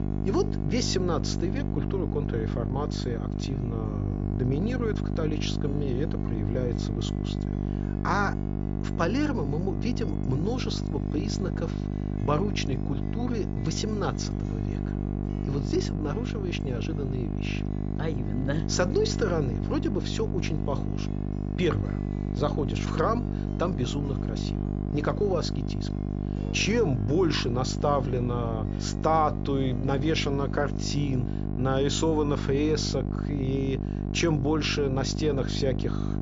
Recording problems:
high frequencies cut off; noticeable; nothing above 7.5 kHz
electrical hum; loud; throughout; 50 Hz, 7 dB below the speech
background music; faint; throughout; 30 dB below the speech

